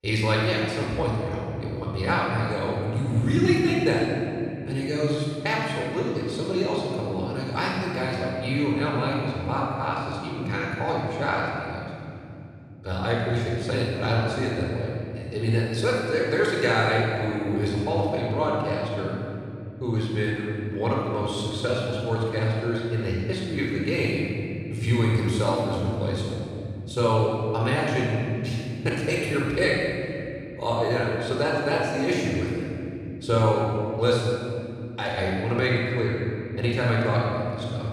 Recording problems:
room echo; strong; dies away in 3 s
off-mic speech; far

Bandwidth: 14.5 kHz